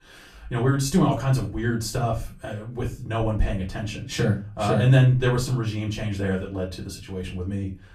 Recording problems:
off-mic speech; far
room echo; very slight; dies away in 0.3 s

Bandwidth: 14.5 kHz